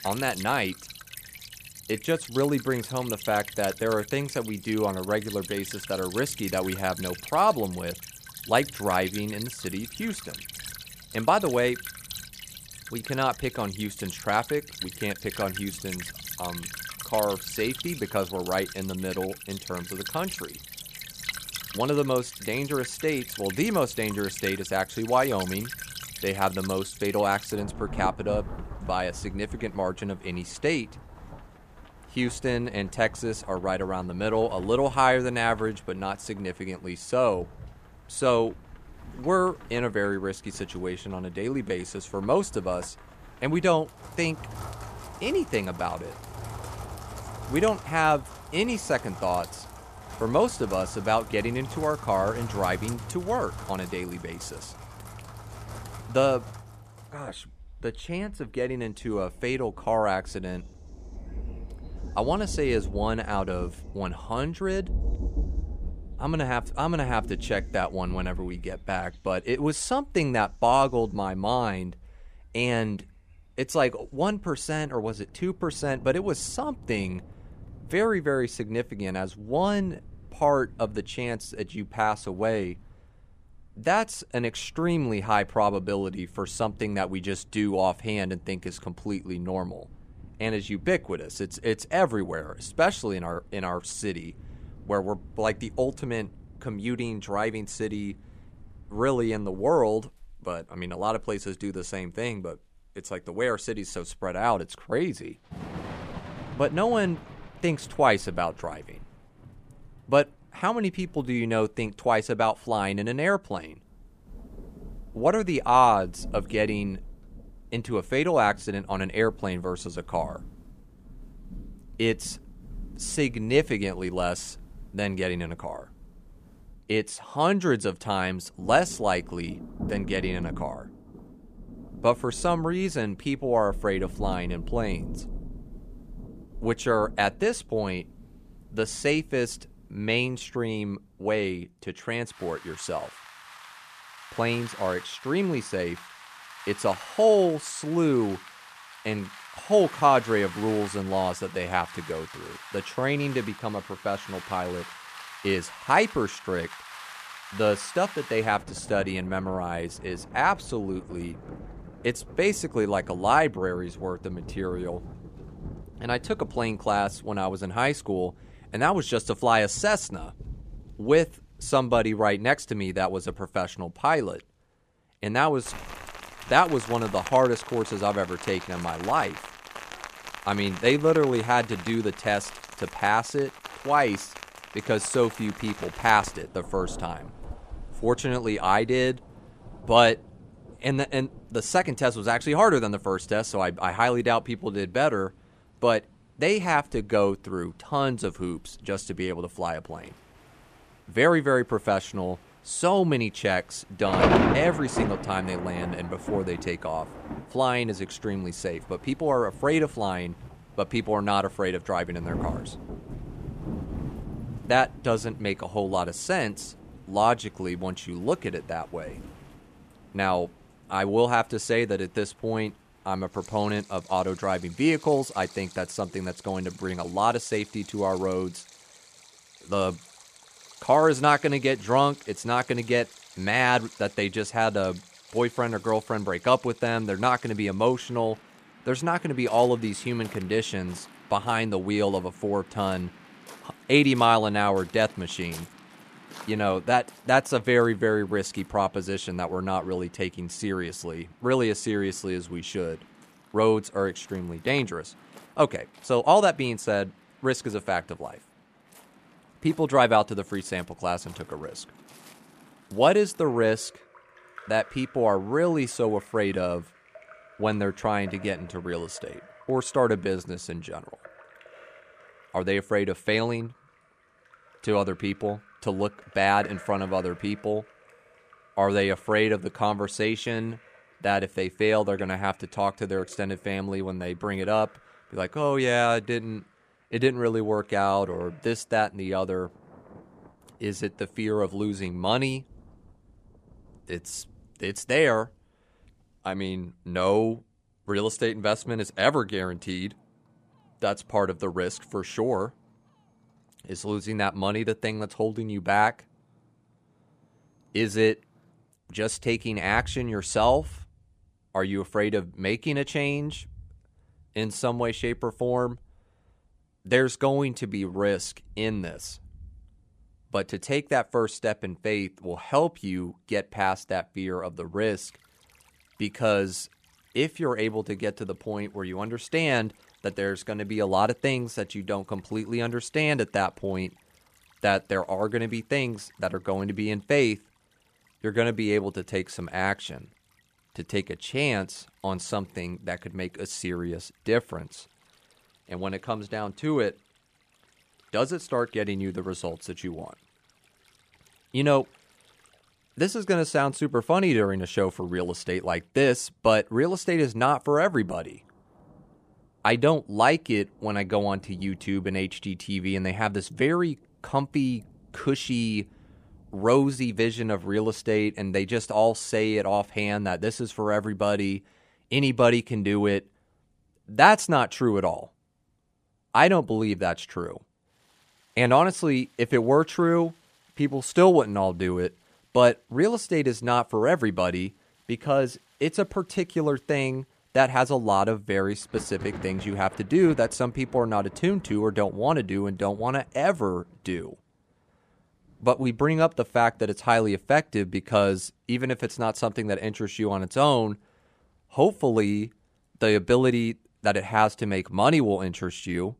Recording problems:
rain or running water; noticeable; throughout; 15 dB below the speech

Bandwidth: 14.5 kHz